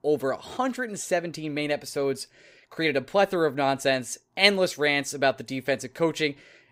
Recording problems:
none

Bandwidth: 15.5 kHz